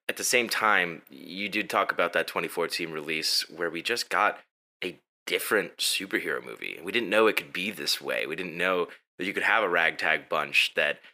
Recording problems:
thin; somewhat; fading below 350 Hz

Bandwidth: 15 kHz